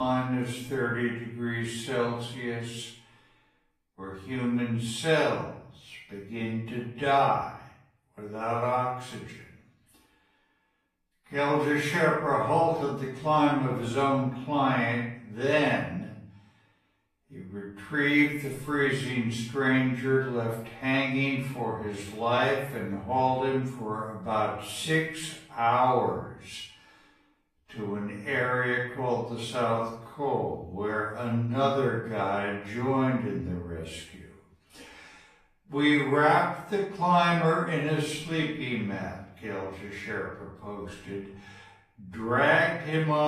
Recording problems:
off-mic speech; far
wrong speed, natural pitch; too slow; 0.6 times normal speed
room echo; noticeable; dies away in 0.6 s
garbled, watery; slightly; nothing above 14.5 kHz
abrupt cut into speech; at the start and the end

